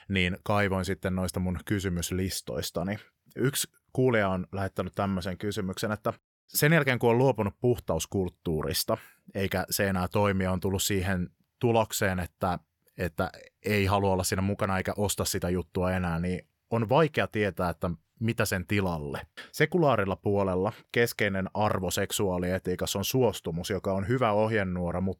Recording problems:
none

